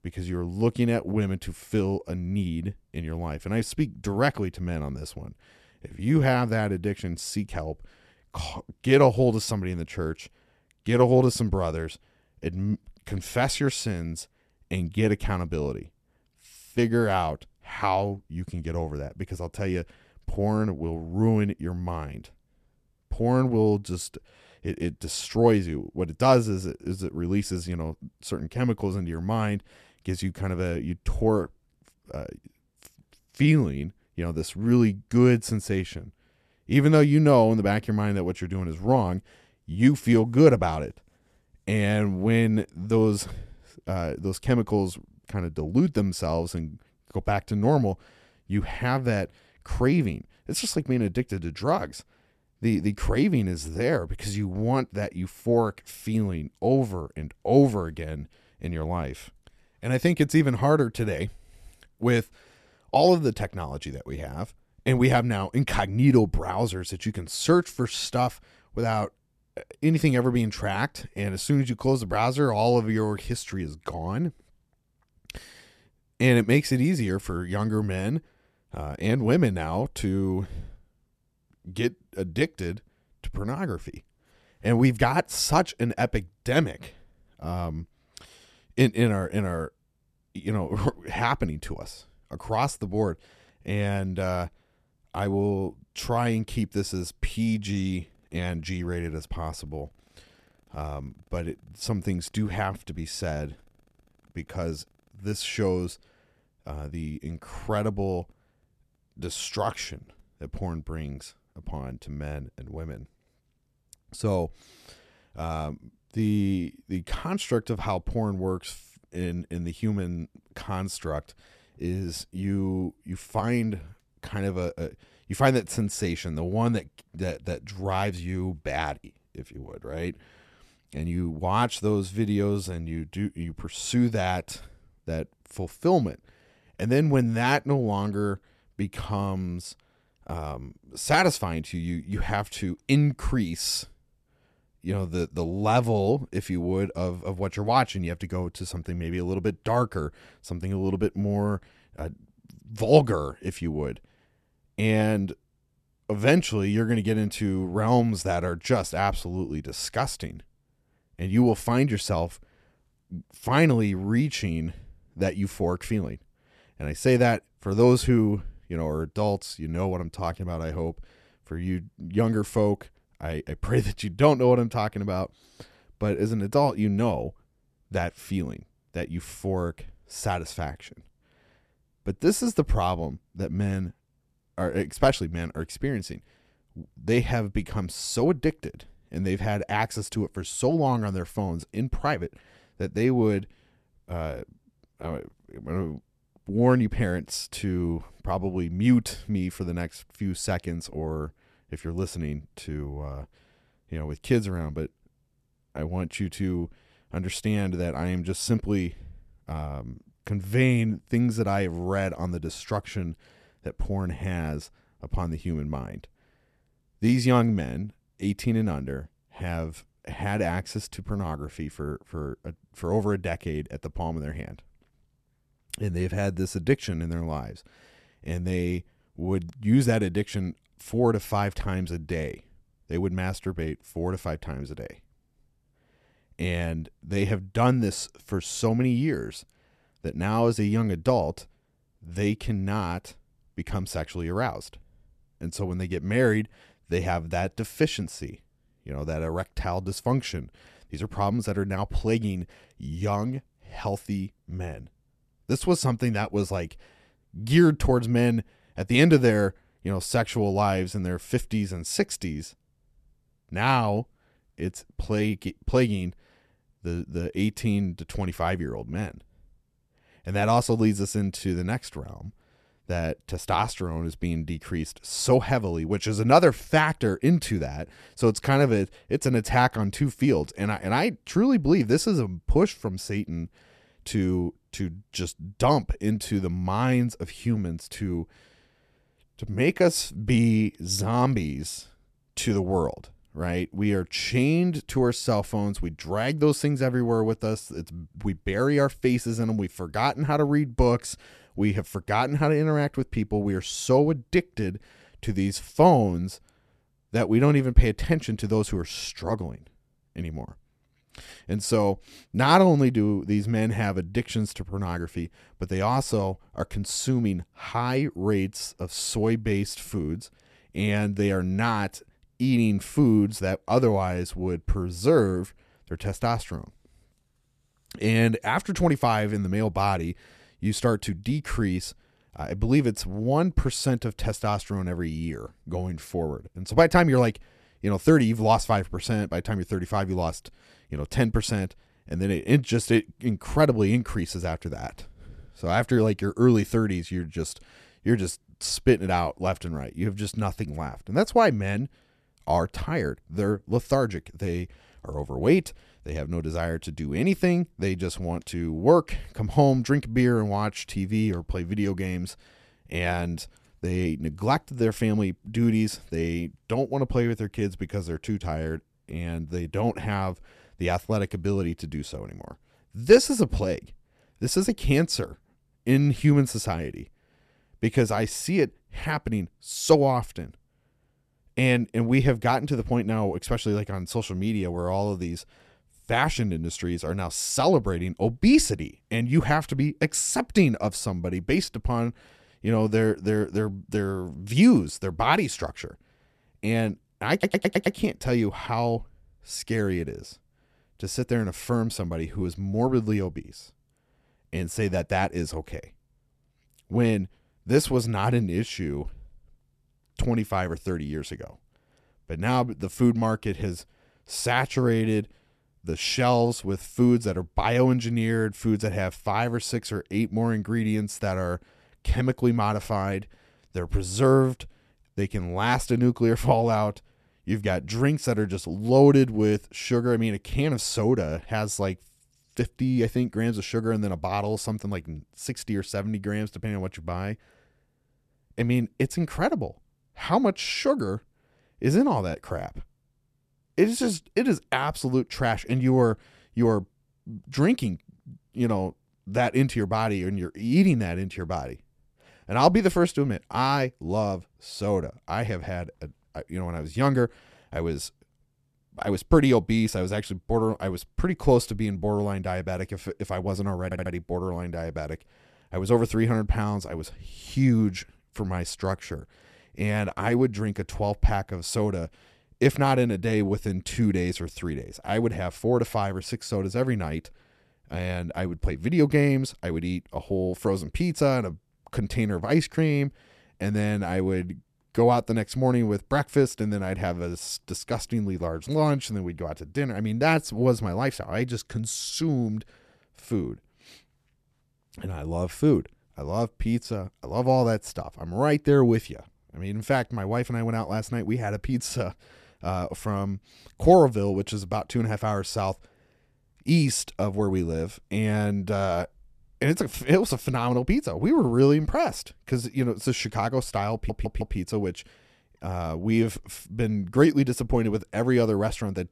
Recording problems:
audio stuttering; at 6:37, at 7:44 and at 8:34

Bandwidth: 14 kHz